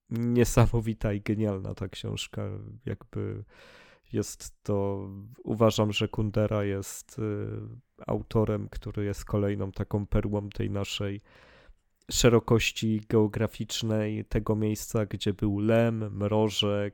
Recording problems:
none

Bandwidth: 17.5 kHz